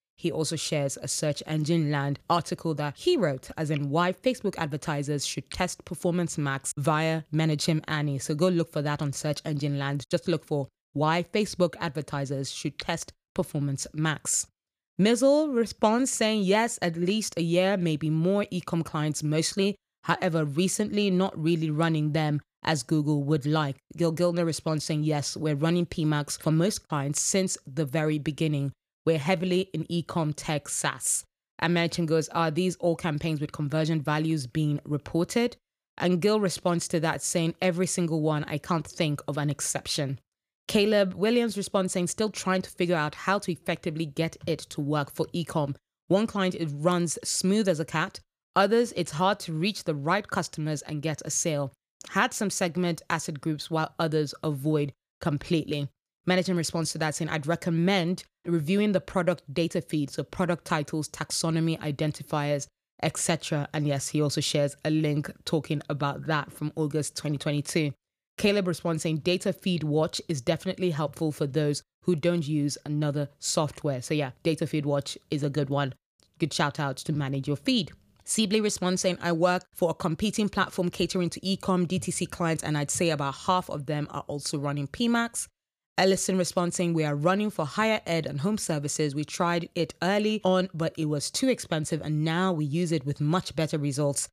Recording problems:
none

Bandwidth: 15 kHz